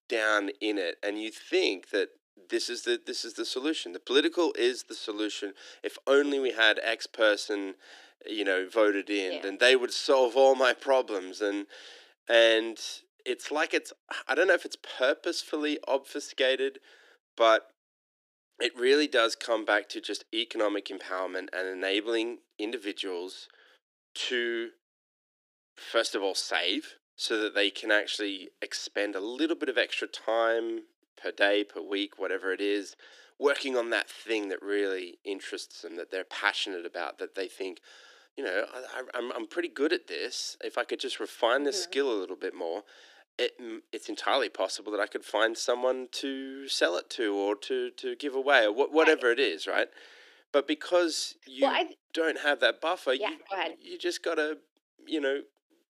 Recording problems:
thin; somewhat; fading below 300 Hz

